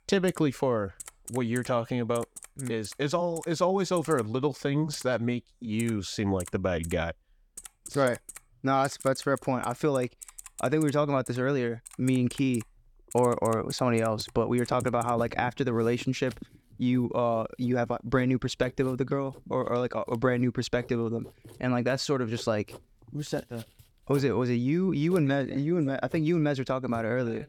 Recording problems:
household noises; noticeable; throughout; 20 dB below the speech

